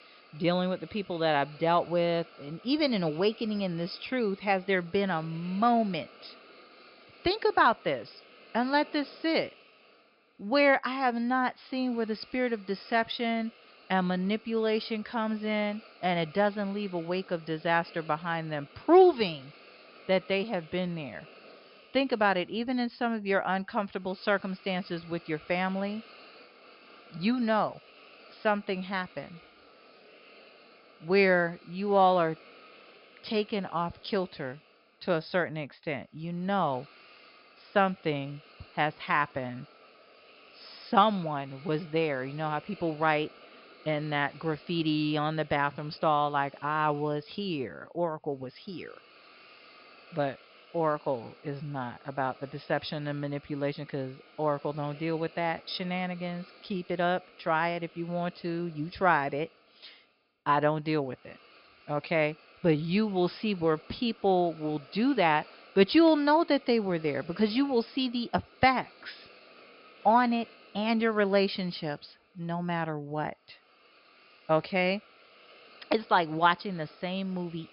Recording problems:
high frequencies cut off; noticeable; nothing above 5.5 kHz
hiss; faint; throughout; 25 dB below the speech

